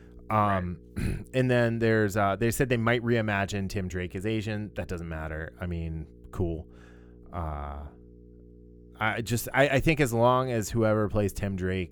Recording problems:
electrical hum; faint; throughout; 60 Hz, 30 dB below the speech

